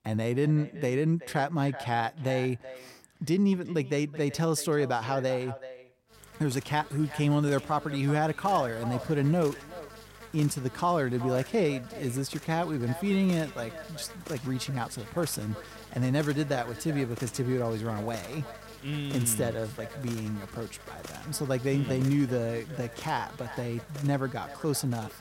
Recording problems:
echo of what is said; noticeable; throughout; 380 ms later, 15 dB below the speech
electrical hum; noticeable; from 6 s on; 50 Hz, 15 dB below the speech

